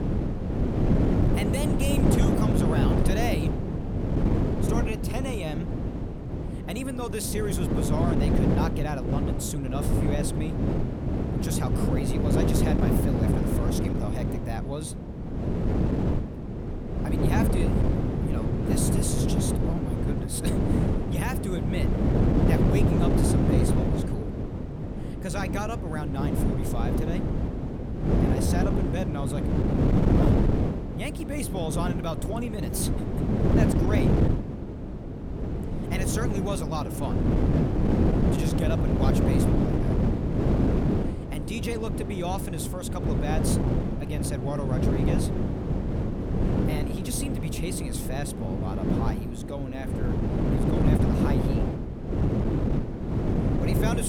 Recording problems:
wind noise on the microphone; heavy; 3 dB above the speech
abrupt cut into speech; at the end

